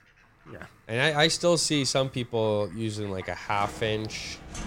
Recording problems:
animal sounds; faint; throughout; 20 dB below the speech

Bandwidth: 16 kHz